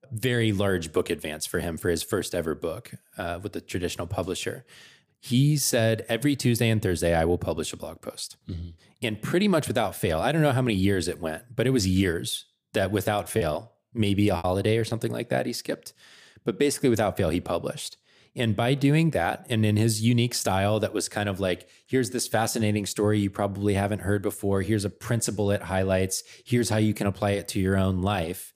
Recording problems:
choppy; very; from 13 to 15 s; 11% of the speech affected

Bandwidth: 15 kHz